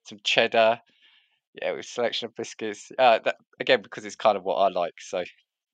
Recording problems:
thin; somewhat; fading below 600 Hz

